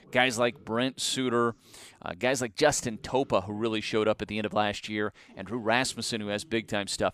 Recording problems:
voice in the background; faint; throughout; 30 dB below the speech

